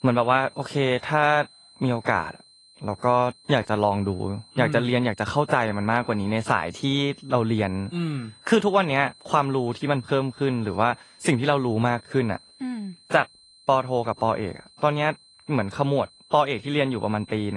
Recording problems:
garbled, watery; slightly; nothing above 10 kHz
high-pitched whine; faint; throughout; 4 kHz, 25 dB below the speech
abrupt cut into speech; at the end

